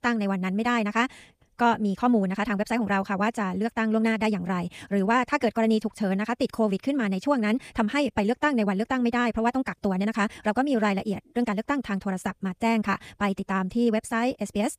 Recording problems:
wrong speed, natural pitch; too fast; 1.6 times normal speed

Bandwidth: 15 kHz